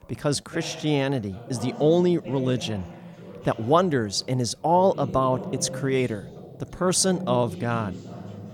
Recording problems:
background chatter; noticeable; throughout; 2 voices, 15 dB below the speech

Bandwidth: 18 kHz